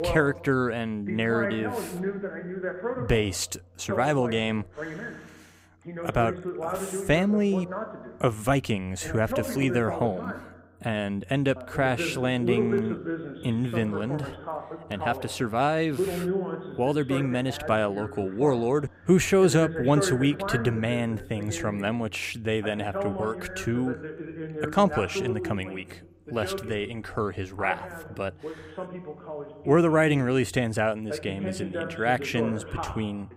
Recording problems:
voice in the background; loud; throughout; 7 dB below the speech

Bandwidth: 15.5 kHz